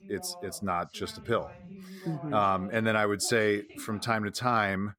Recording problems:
voice in the background; noticeable; throughout; 20 dB below the speech

